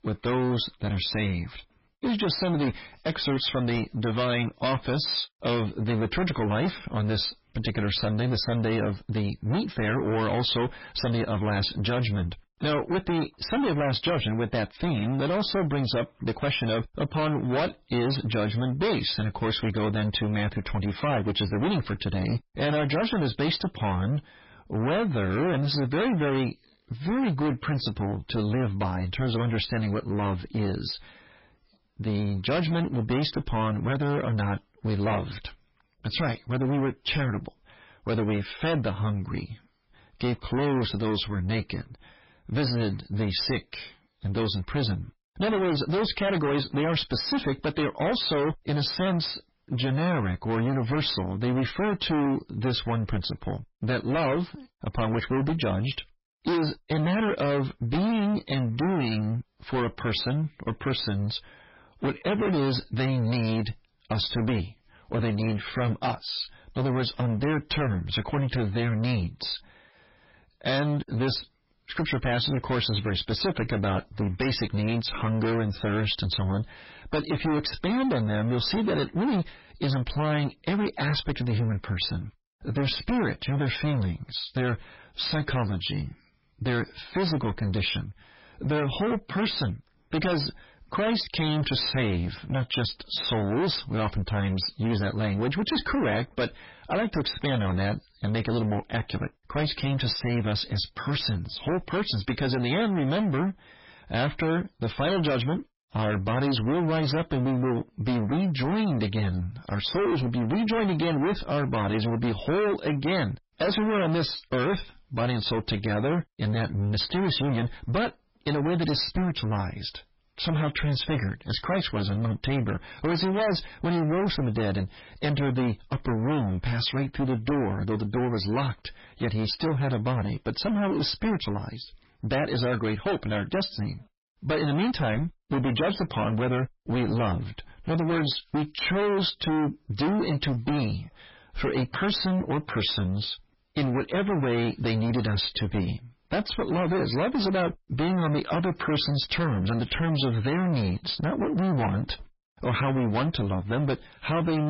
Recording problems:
distortion; heavy; 25% of the sound clipped
garbled, watery; badly; nothing above 5.5 kHz
abrupt cut into speech; at the end

